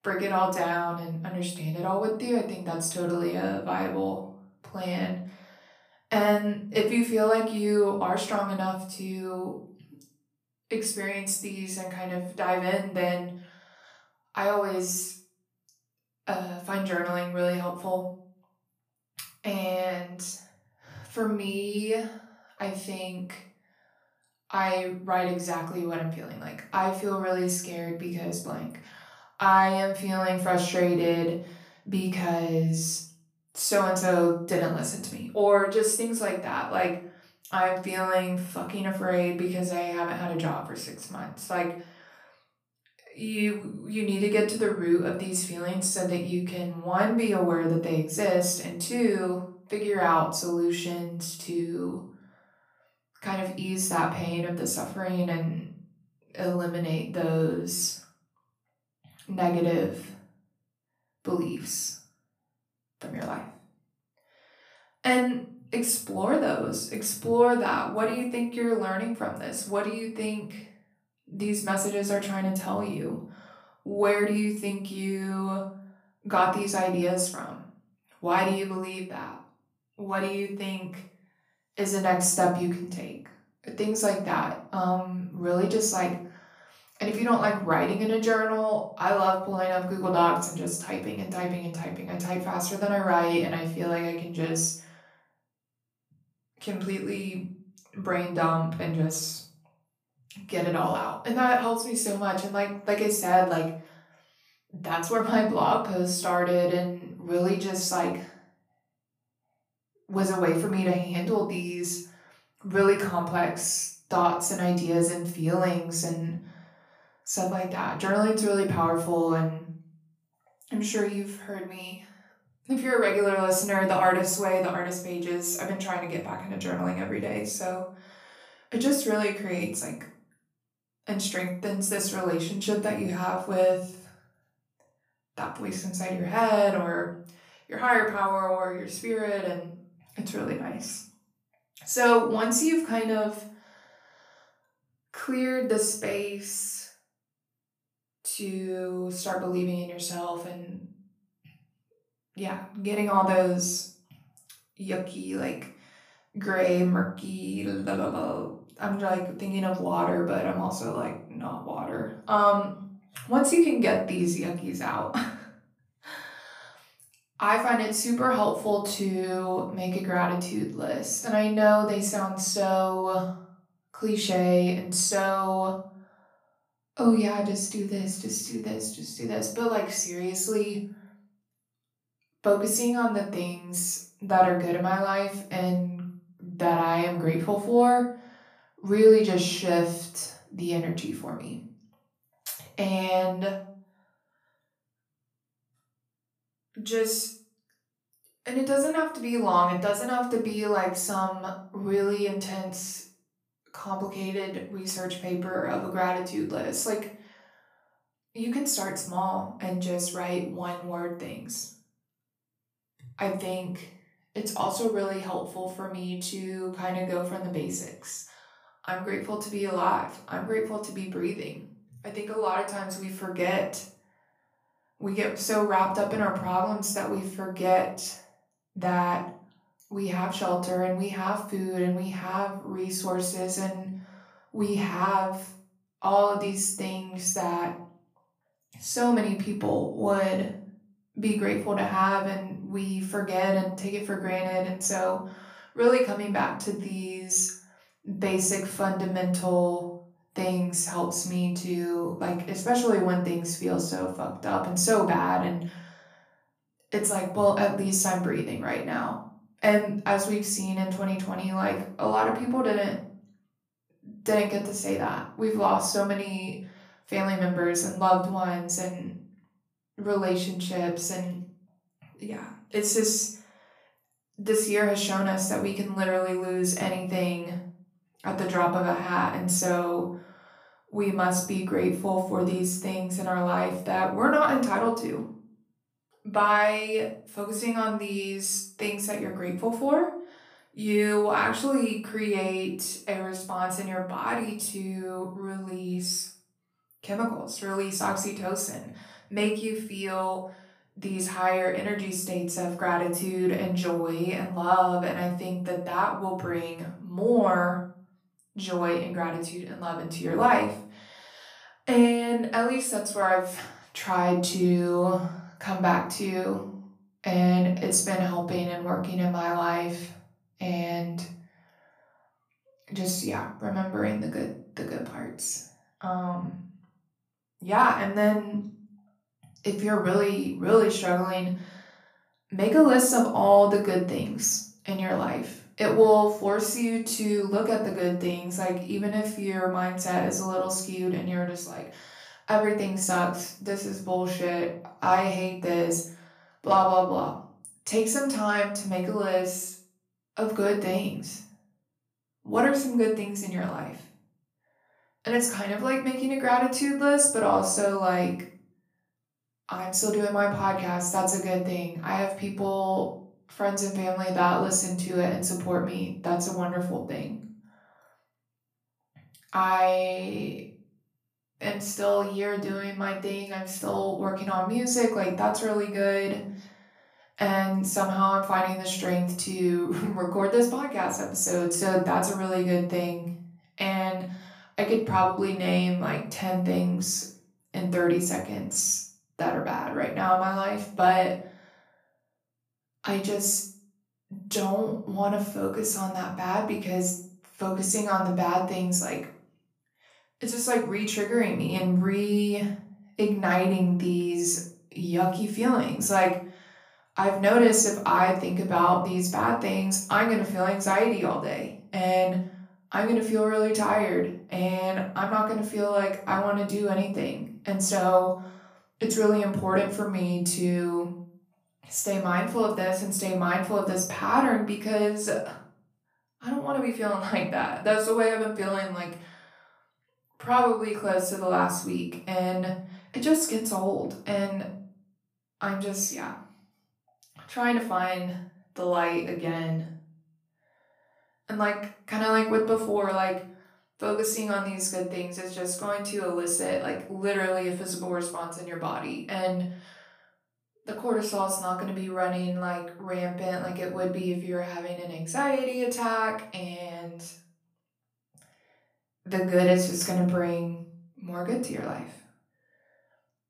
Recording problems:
off-mic speech; far
room echo; slight; dies away in 0.4 s

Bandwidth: 15 kHz